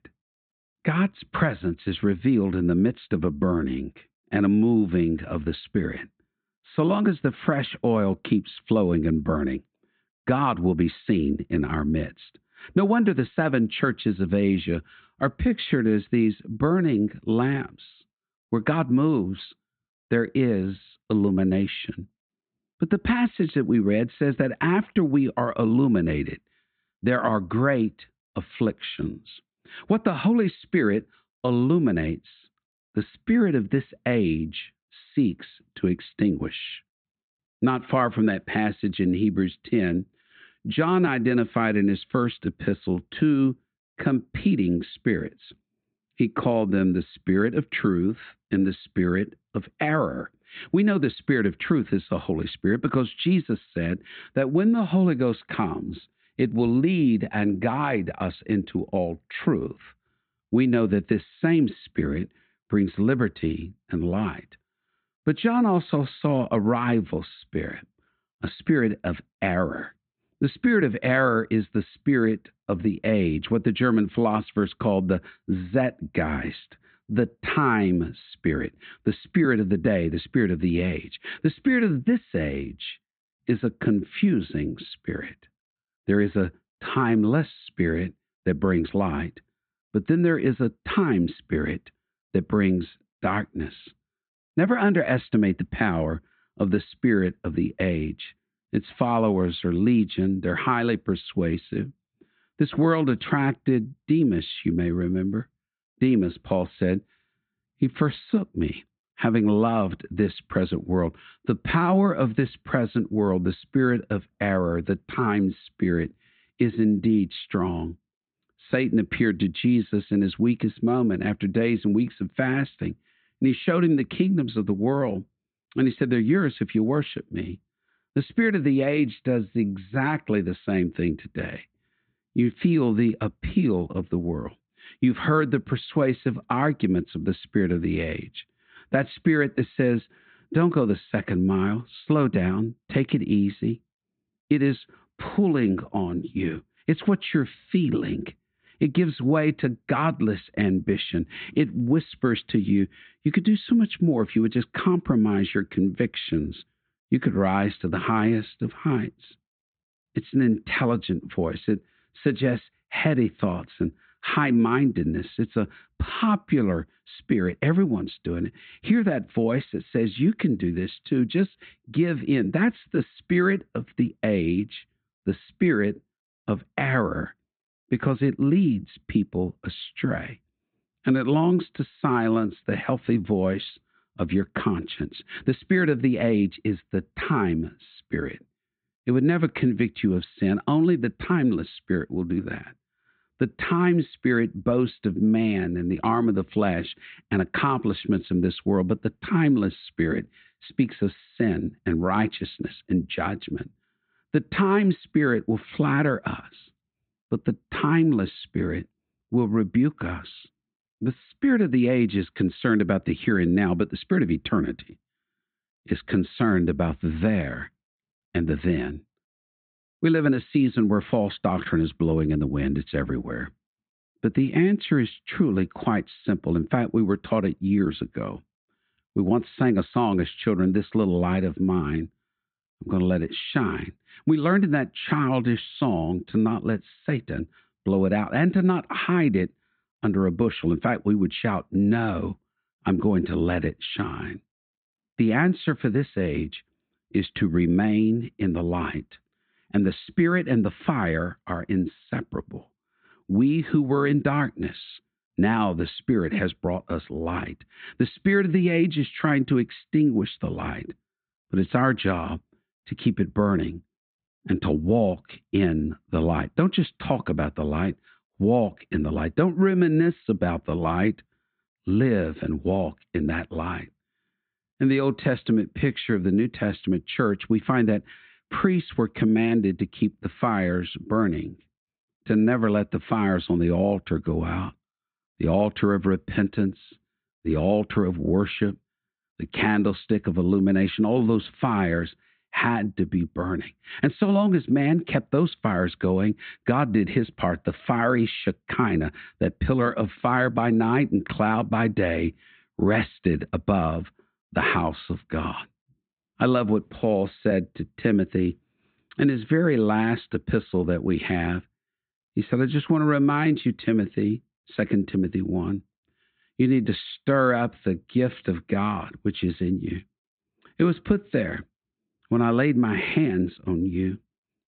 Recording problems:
high frequencies cut off; severe; nothing above 4 kHz

